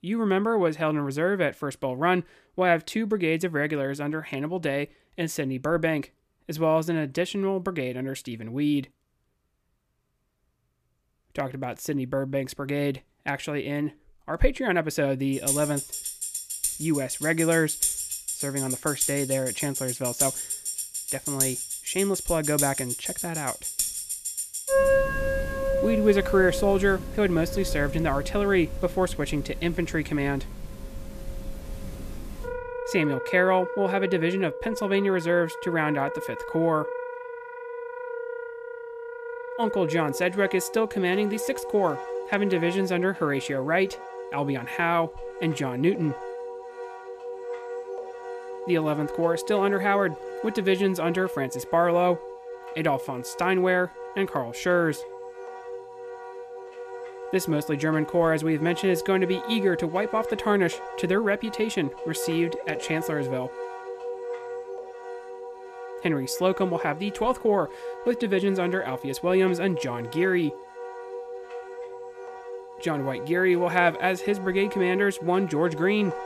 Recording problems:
background music; loud; from 15 s on; 7 dB below the speech

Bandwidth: 14.5 kHz